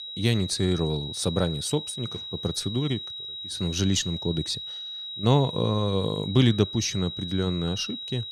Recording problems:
high-pitched whine; loud; throughout; 4 kHz, 7 dB below the speech

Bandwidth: 14.5 kHz